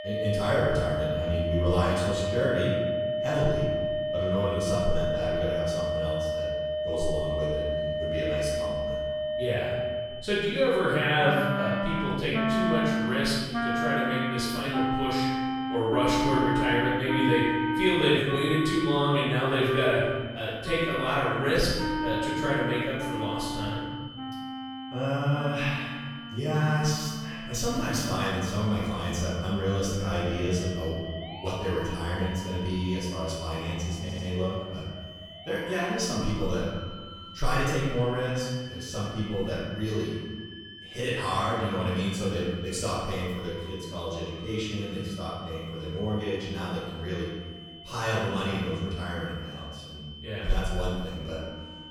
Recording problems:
room echo; strong; dies away in 1.3 s
off-mic speech; far
background music; loud; throughout; 2 dB below the speech
high-pitched whine; noticeable; throughout; 3 kHz, 15 dB below the speech
audio stuttering; at 34 s

